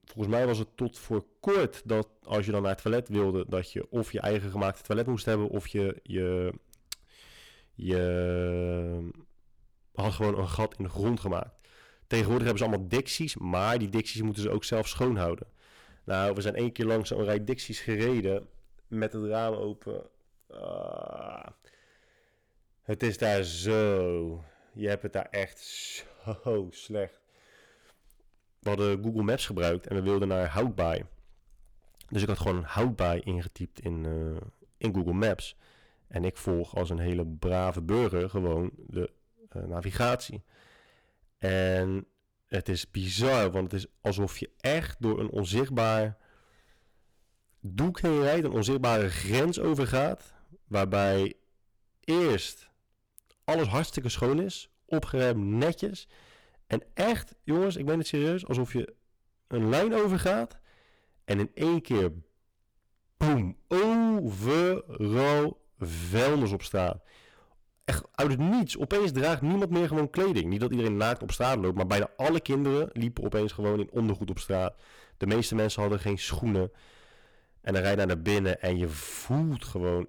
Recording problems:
distortion; heavy; 9% of the sound clipped

